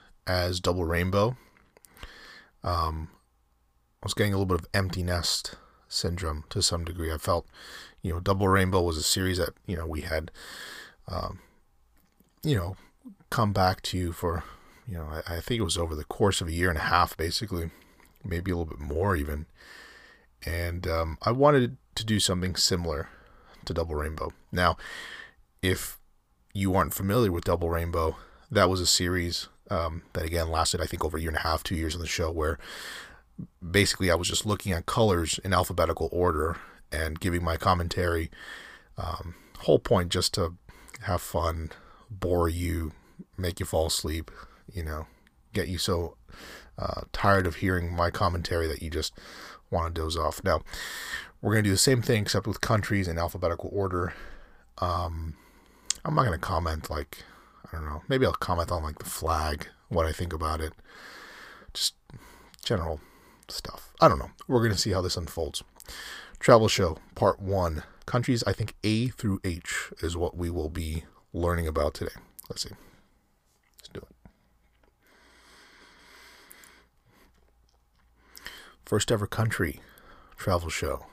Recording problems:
uneven, jittery; strongly; from 8 s to 1:10

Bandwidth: 15 kHz